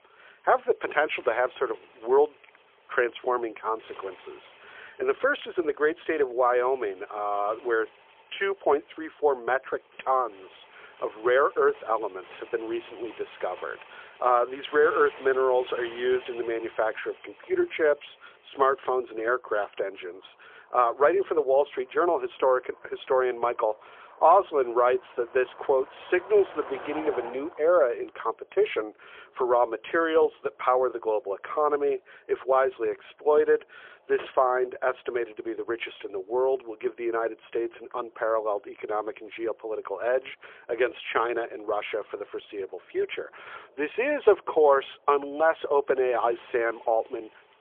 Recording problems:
phone-call audio; poor line; nothing above 3.5 kHz
traffic noise; faint; throughout; 20 dB below the speech

